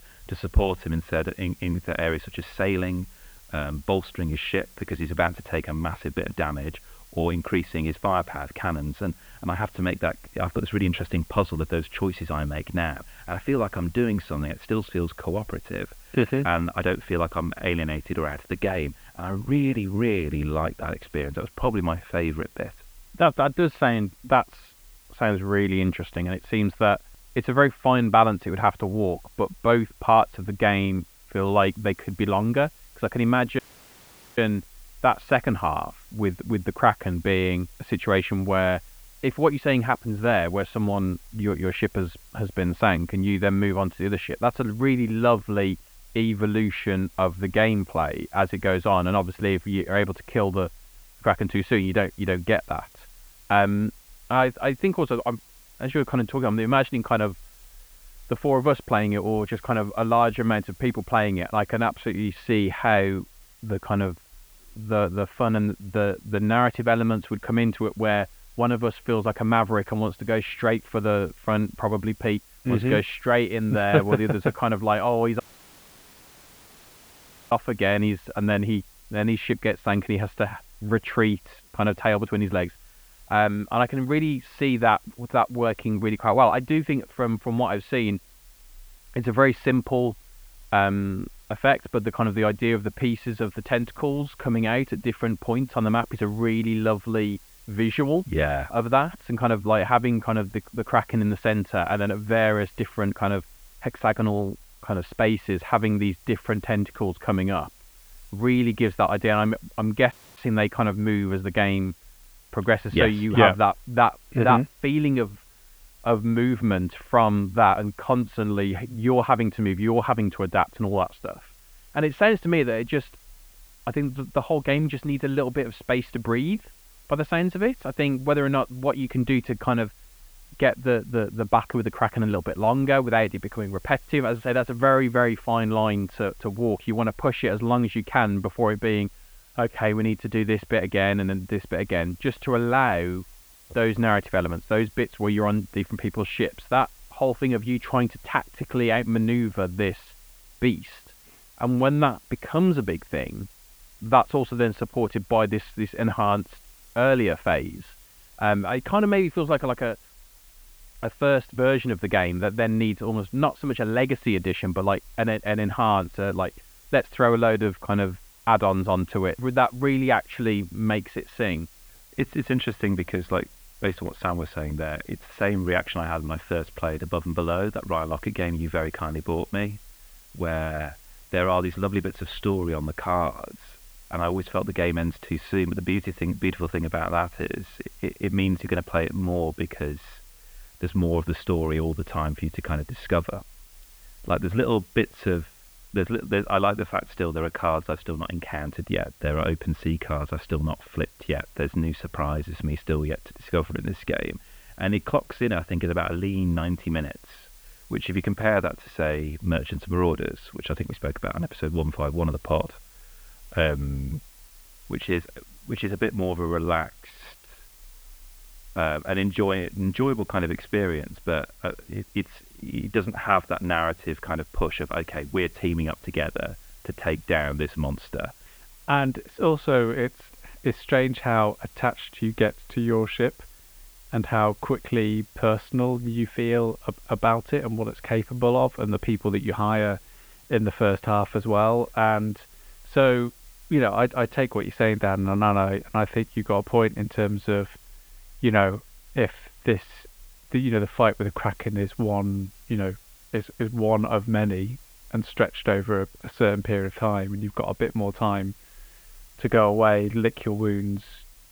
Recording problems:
muffled; very; fading above 3 kHz
hiss; faint; throughout; 25 dB below the speech
audio cutting out; at 34 s for 1 s, at 1:15 for 2 s and at 1:50

